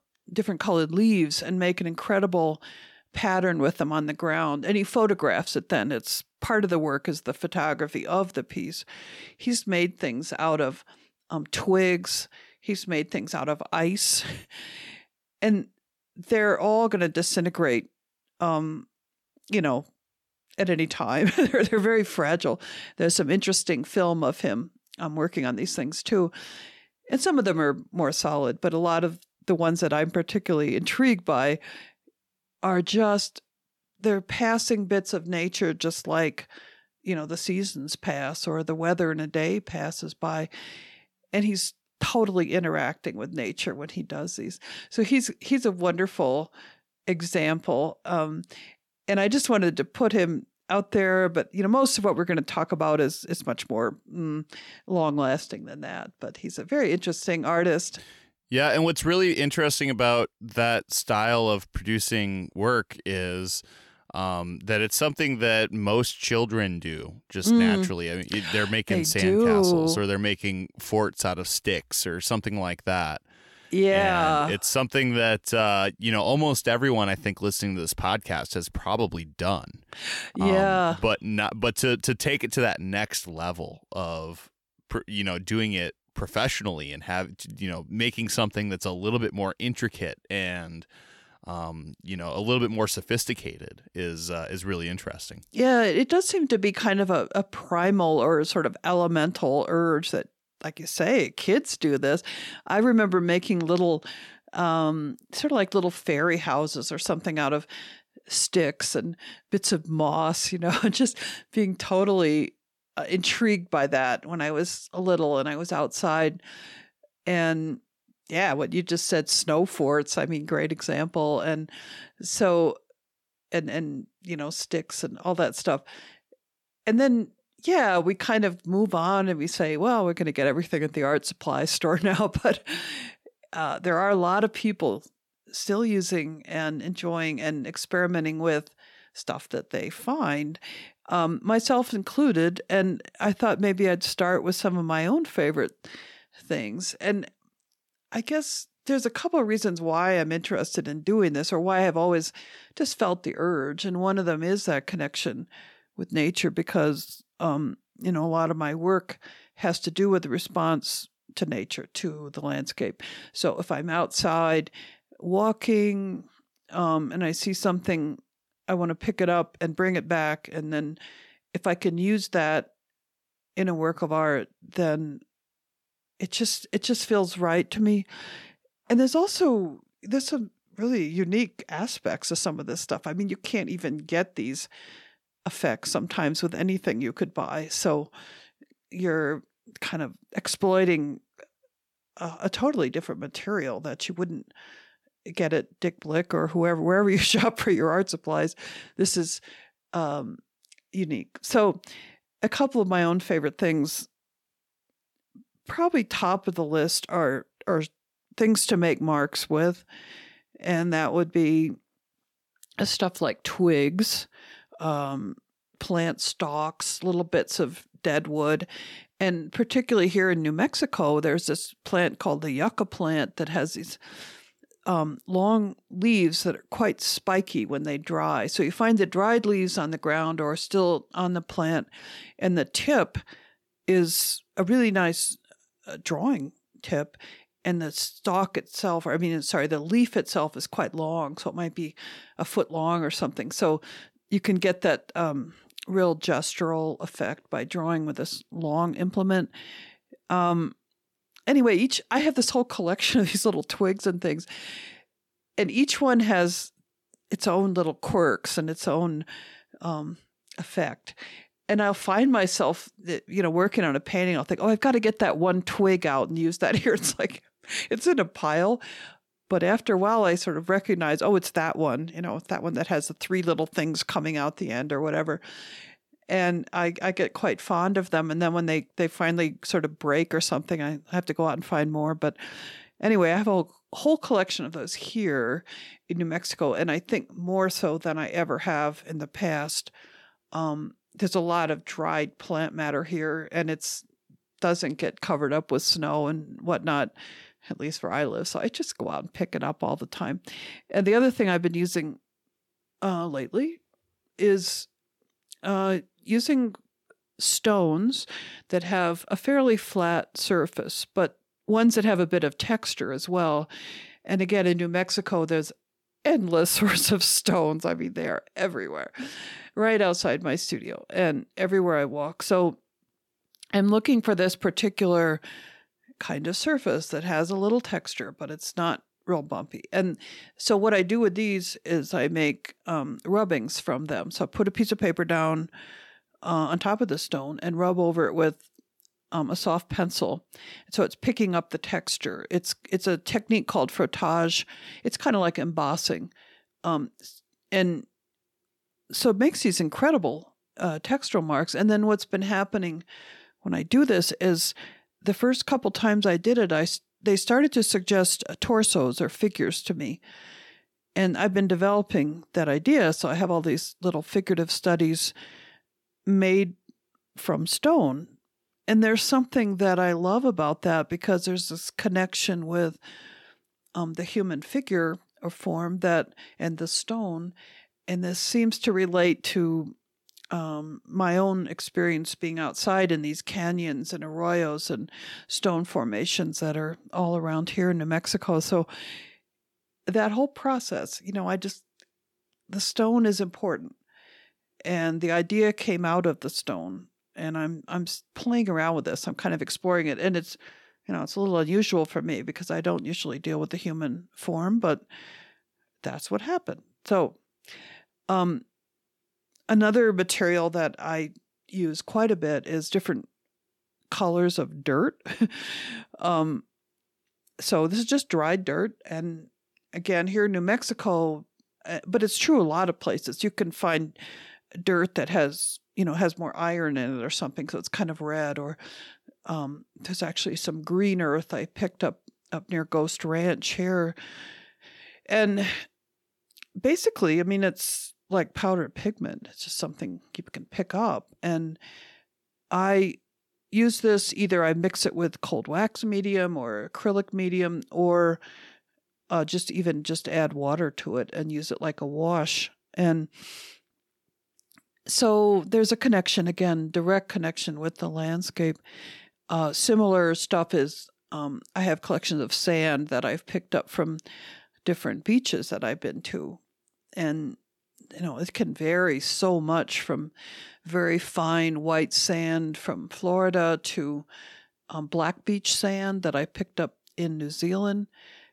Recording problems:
none

